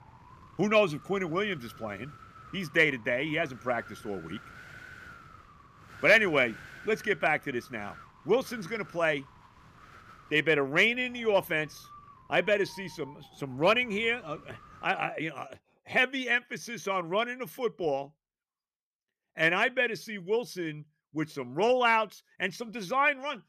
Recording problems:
wind noise on the microphone; occasional gusts; until 15 s; 25 dB below the speech

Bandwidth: 14.5 kHz